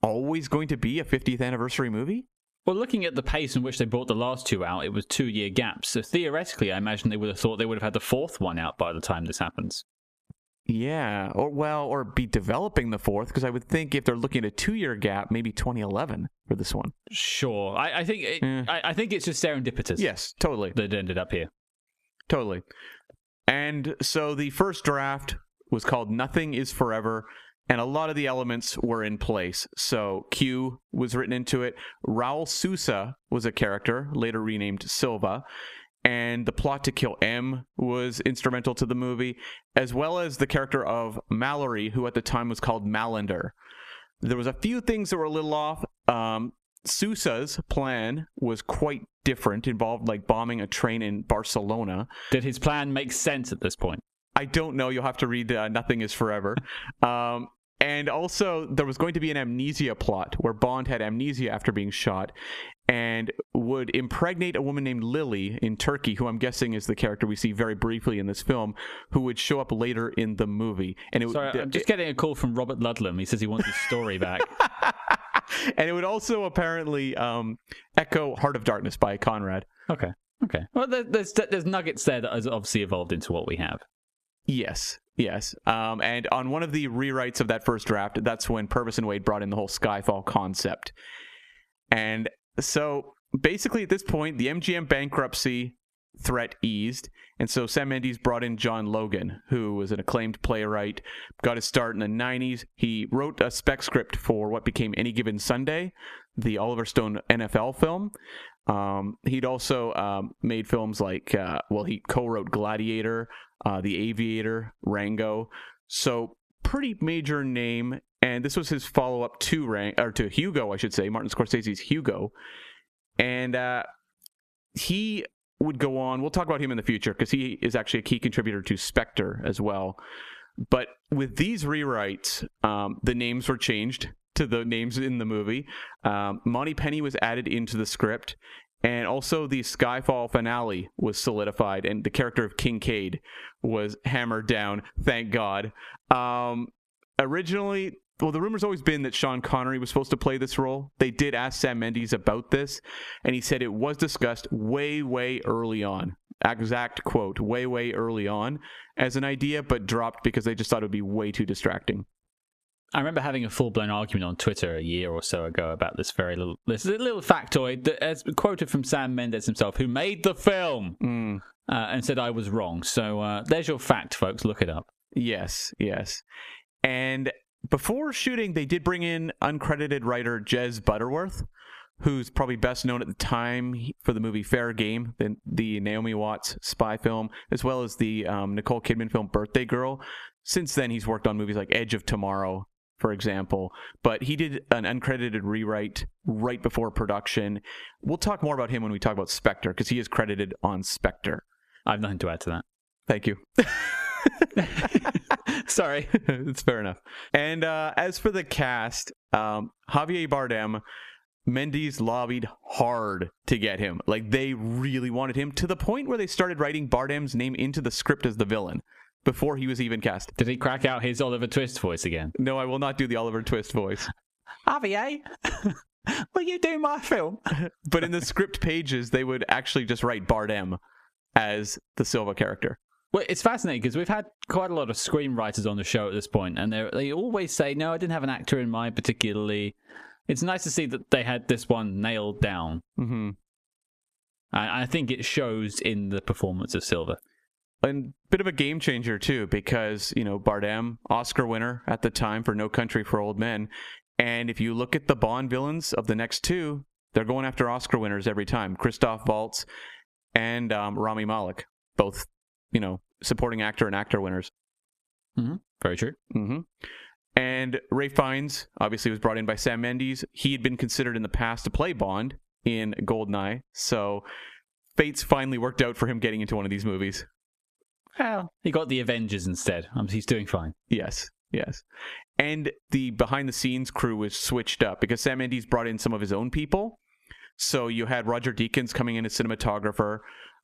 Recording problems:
squashed, flat; somewhat

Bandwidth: 14.5 kHz